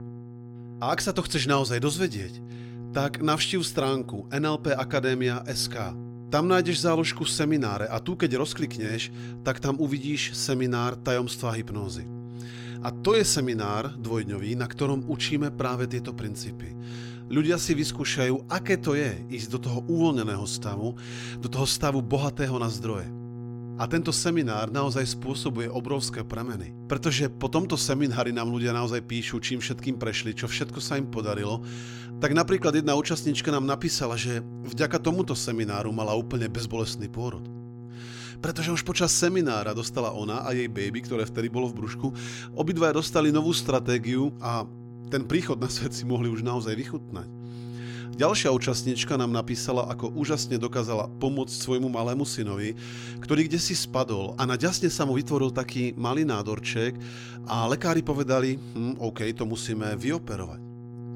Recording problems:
electrical hum; noticeable; throughout; 60 Hz, 20 dB below the speech

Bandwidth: 16.5 kHz